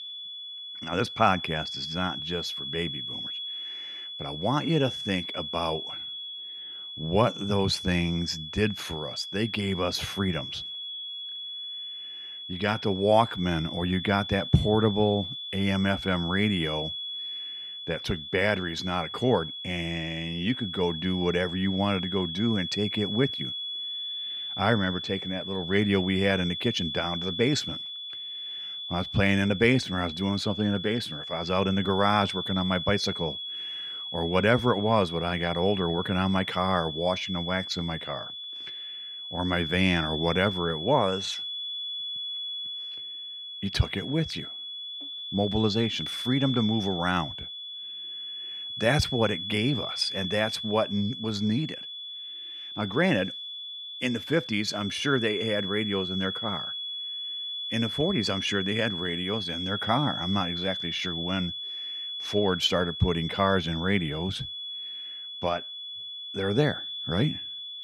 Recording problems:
high-pitched whine; loud; throughout; 3.5 kHz, 6 dB below the speech

